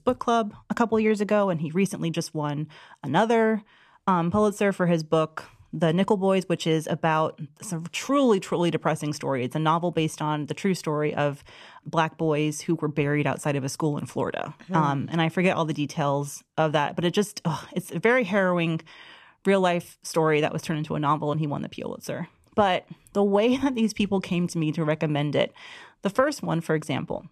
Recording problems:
none

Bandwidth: 14 kHz